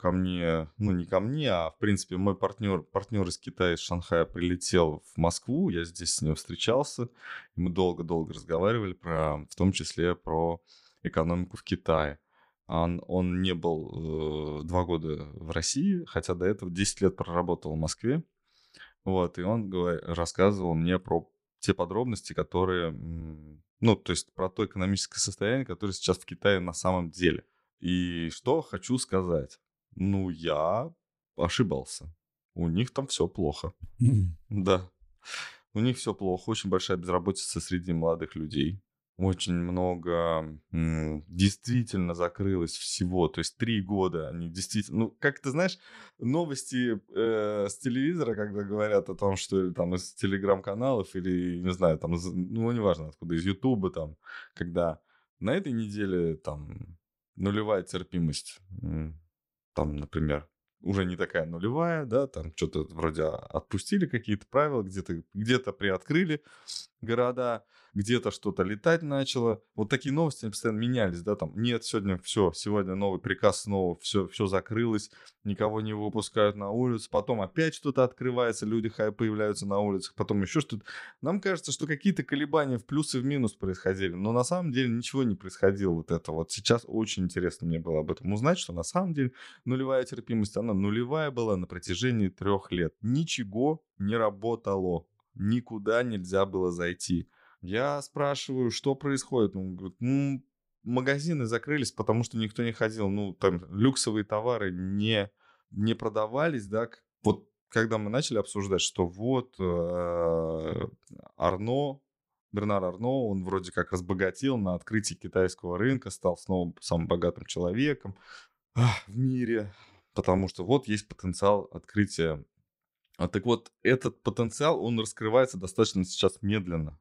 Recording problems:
none

